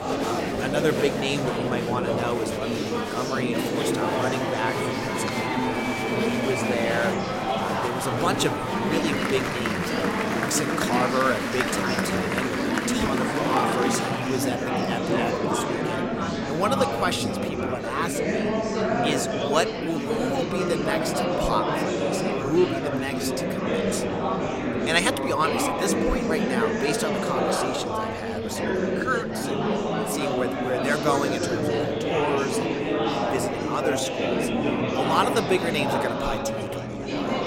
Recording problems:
murmuring crowd; very loud; throughout; 3 dB above the speech

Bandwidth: 16 kHz